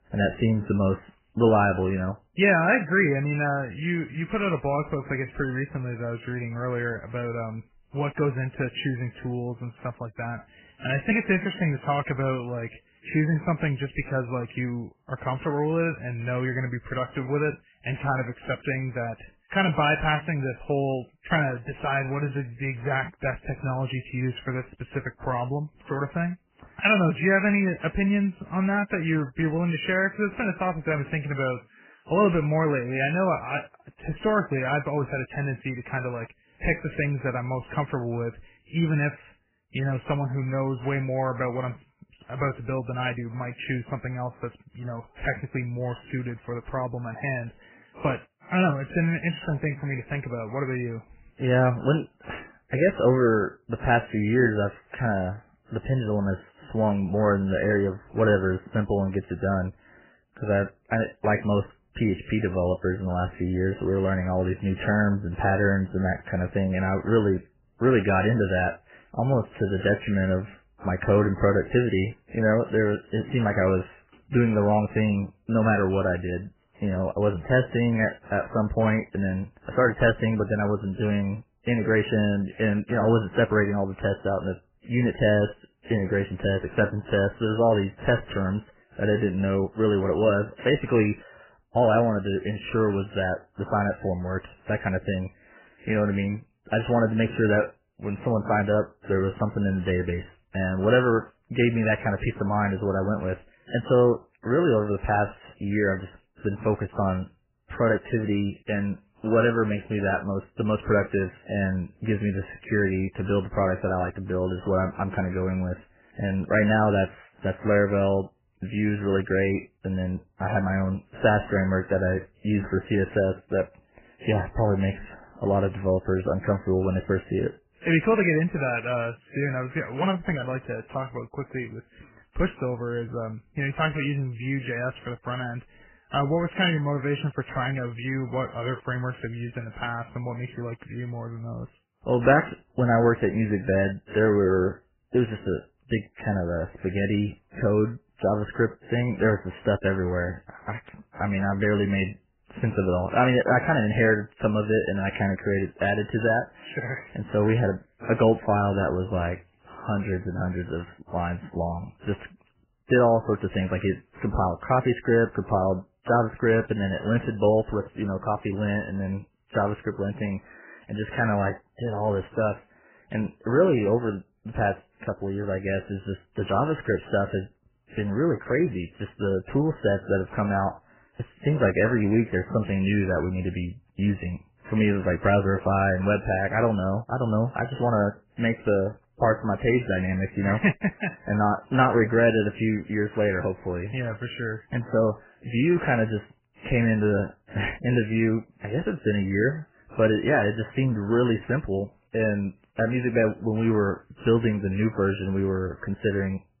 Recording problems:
garbled, watery; badly; nothing above 3 kHz

